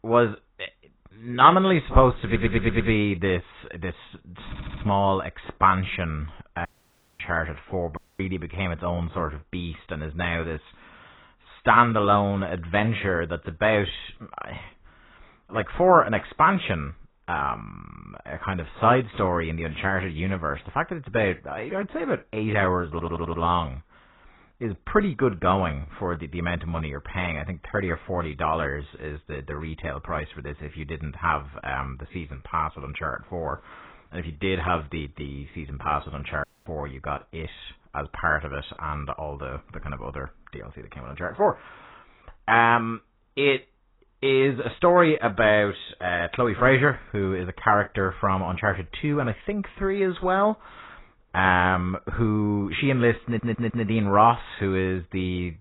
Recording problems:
garbled, watery; badly; nothing above 4 kHz
audio stuttering; 4 times, first at 2.5 s
audio cutting out; at 6.5 s for 0.5 s, at 8 s and at 36 s

